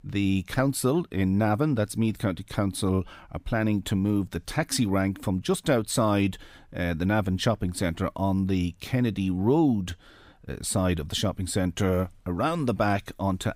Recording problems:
none

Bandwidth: 15.5 kHz